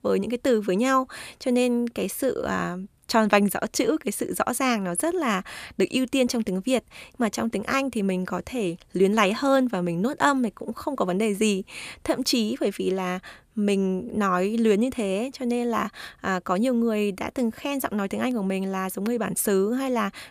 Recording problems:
none

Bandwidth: 14.5 kHz